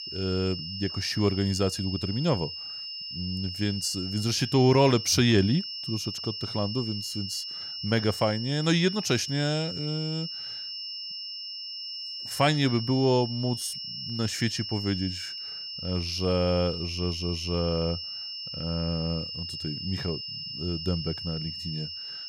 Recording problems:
high-pitched whine; loud; throughout; 5.5 kHz, 6 dB below the speech

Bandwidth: 16.5 kHz